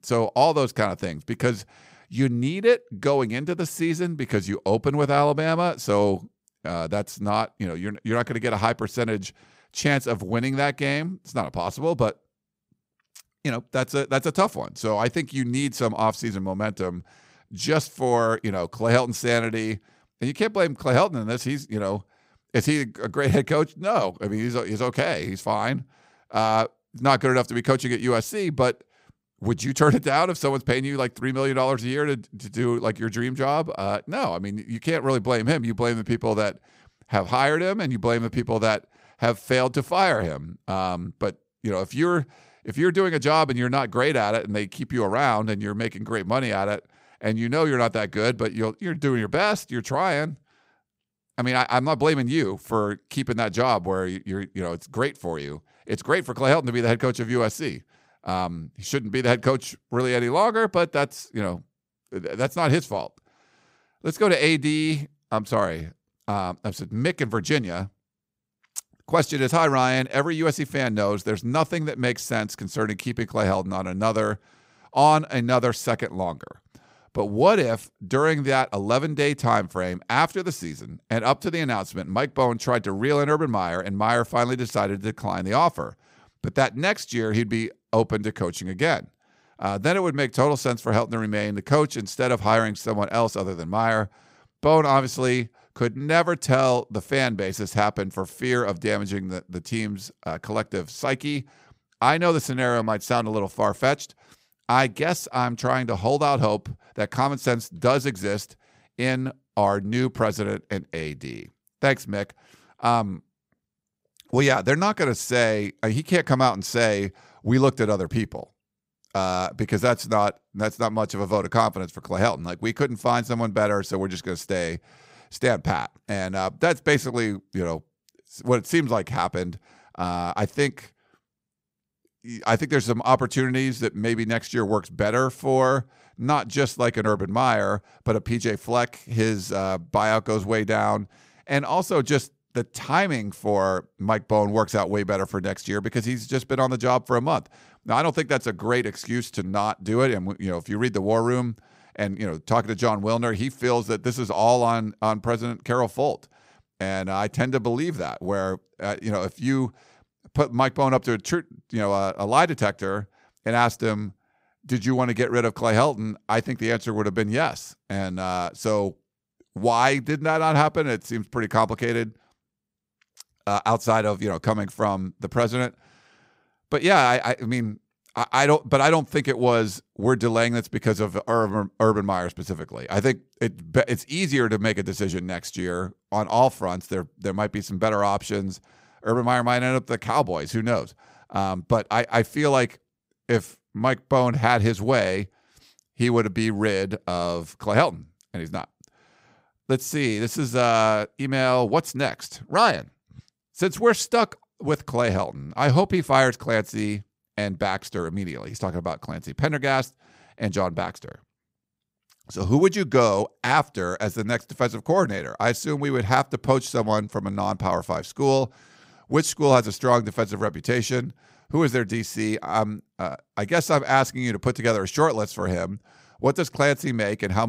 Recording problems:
abrupt cut into speech; at the end

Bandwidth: 15.5 kHz